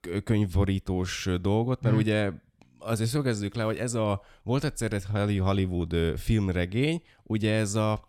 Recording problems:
none

